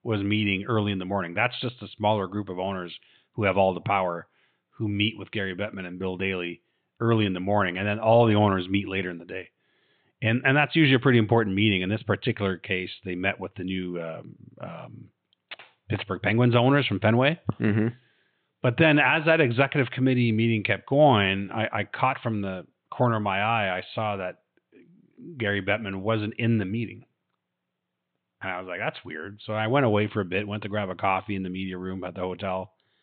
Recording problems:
high frequencies cut off; severe; nothing above 4 kHz

